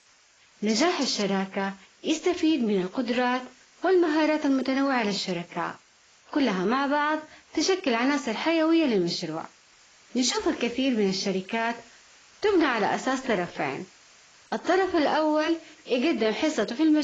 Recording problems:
garbled, watery; badly; nothing above 7.5 kHz
hiss; faint; throughout; 30 dB below the speech
abrupt cut into speech; at the end

